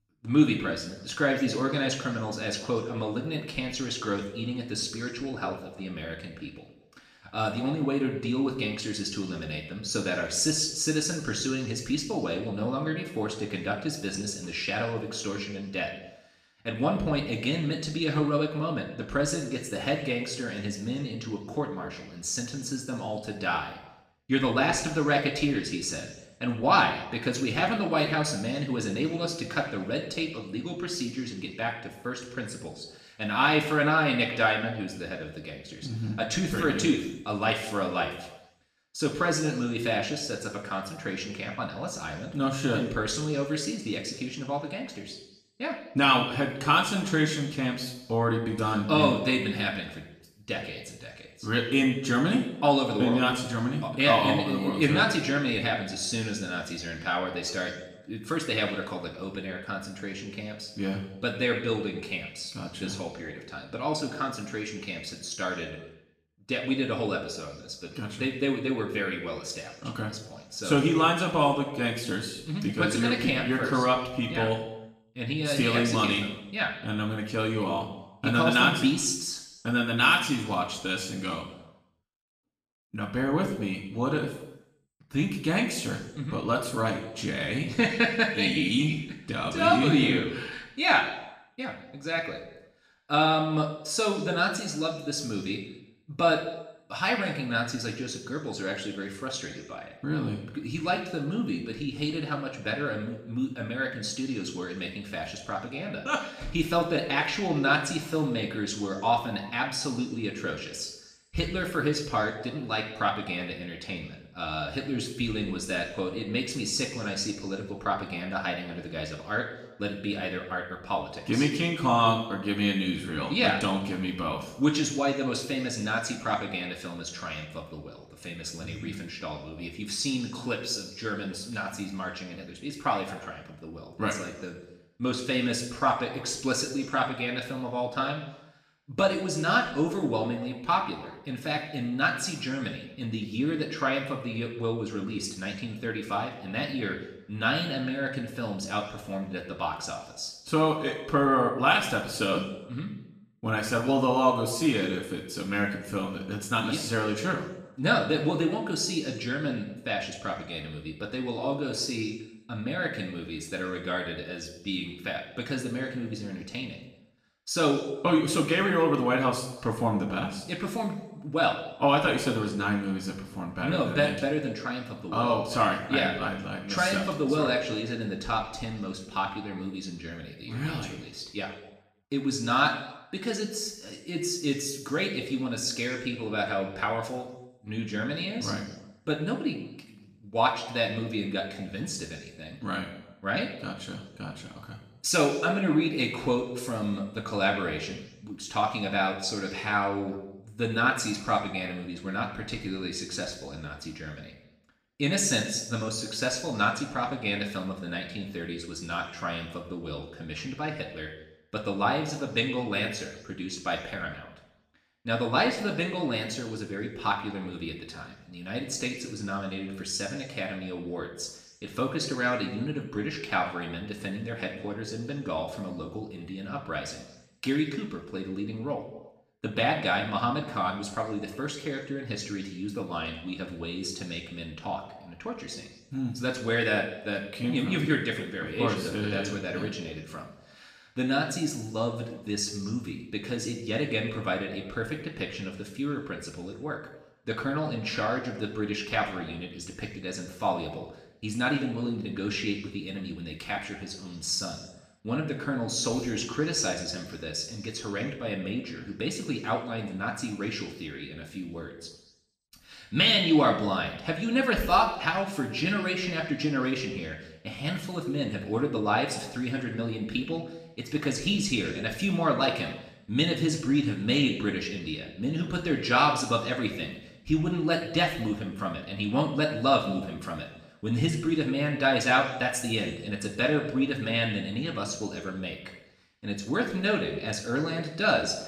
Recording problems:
off-mic speech; far
room echo; noticeable; dies away in 0.9 s

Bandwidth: 14.5 kHz